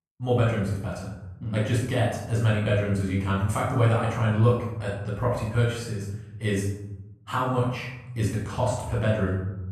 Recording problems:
off-mic speech; far
room echo; noticeable; dies away in 0.9 s

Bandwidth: 13.5 kHz